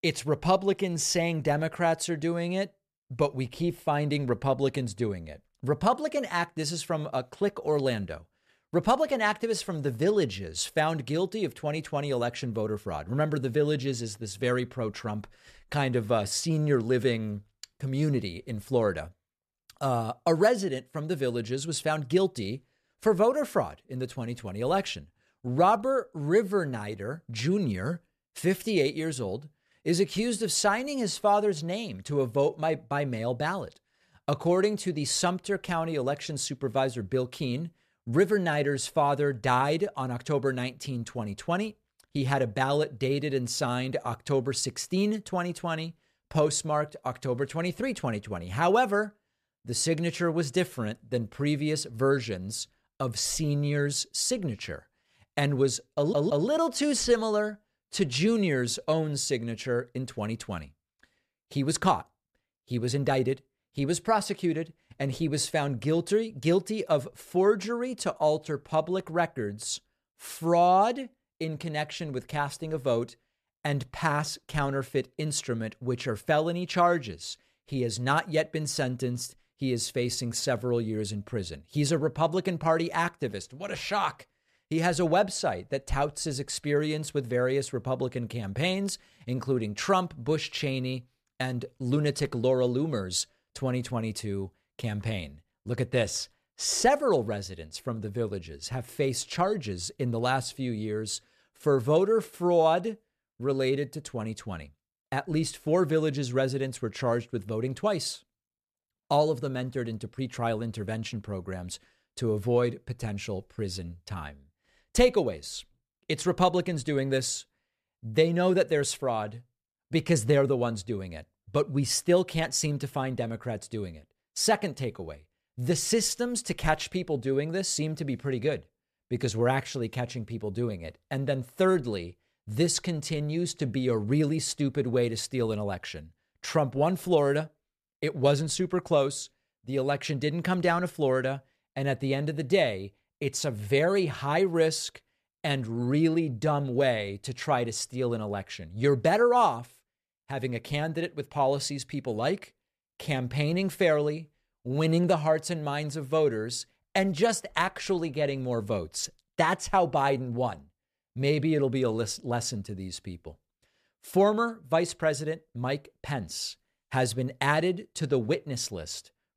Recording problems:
audio stuttering; at 56 s

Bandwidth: 14.5 kHz